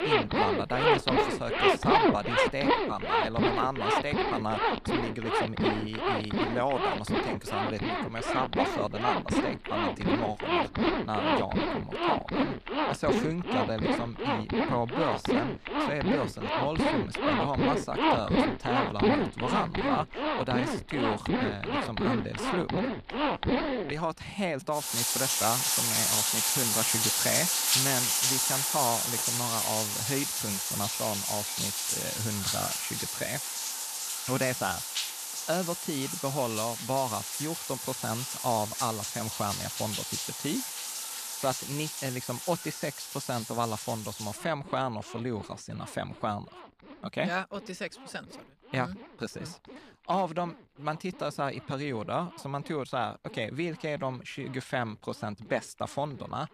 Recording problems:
household noises; very loud; throughout; 5 dB above the speech

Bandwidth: 14 kHz